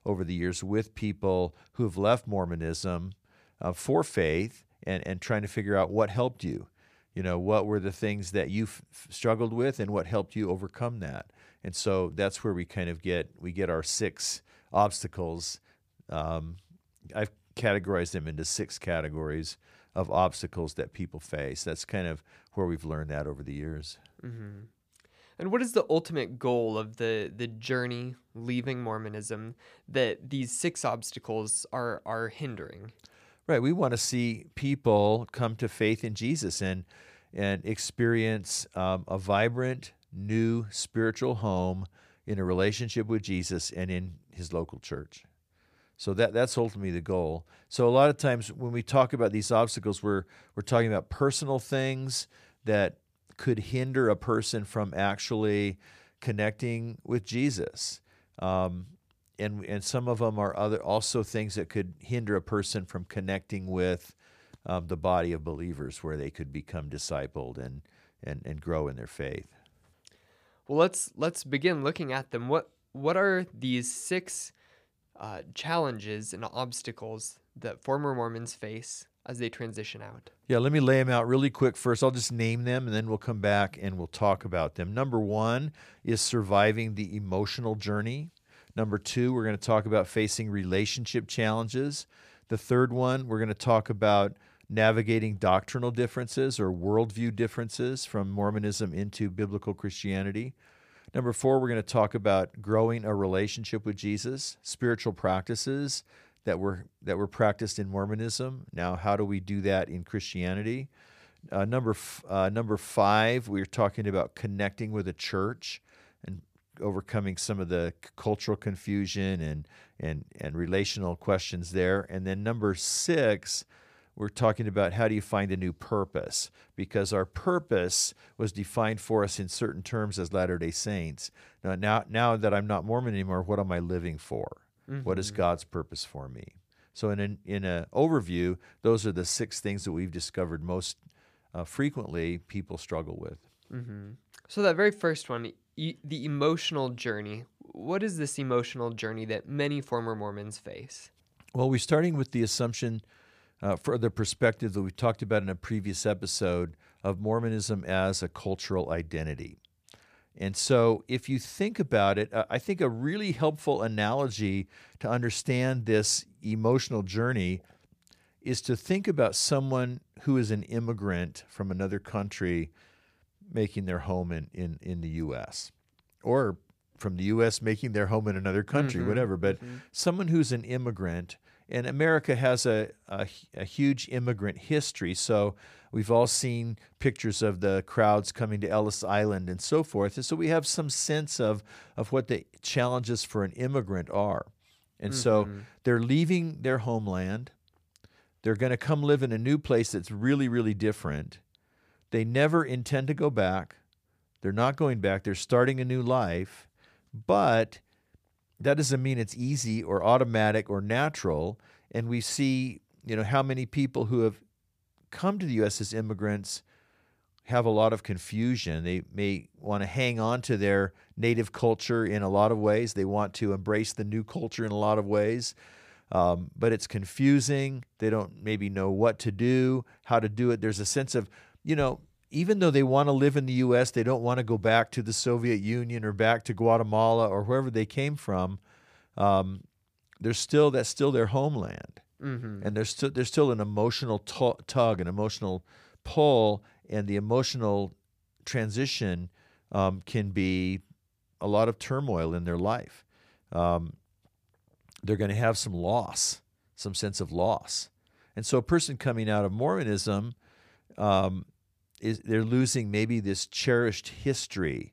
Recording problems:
none

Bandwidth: 15 kHz